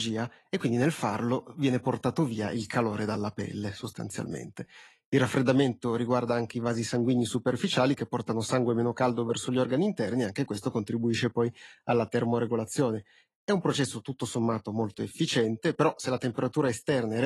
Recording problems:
garbled, watery; slightly; nothing above 11.5 kHz
abrupt cut into speech; at the start and the end

